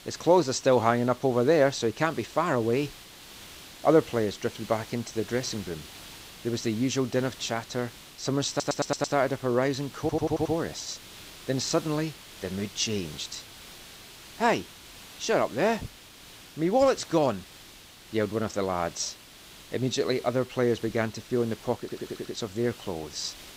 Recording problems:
garbled, watery; slightly; nothing above 8 kHz
hiss; noticeable; throughout; 15 dB below the speech
audio stuttering; at 8.5 s, at 10 s and at 22 s

